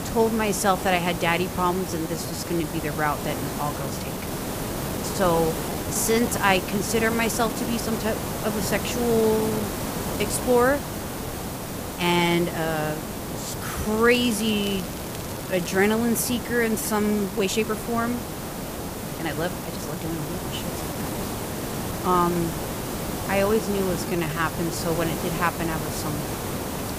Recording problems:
hiss; loud; throughout; 5 dB below the speech
crackling; noticeable; from 14 to 16 s; 15 dB below the speech
uneven, jittery; strongly; from 2 to 24 s

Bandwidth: 15 kHz